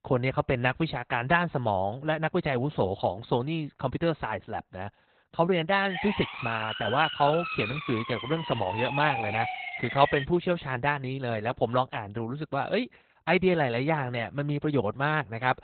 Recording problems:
garbled, watery; badly; nothing above 4 kHz
siren; noticeable; from 6 to 10 s; peak 3 dB below the speech

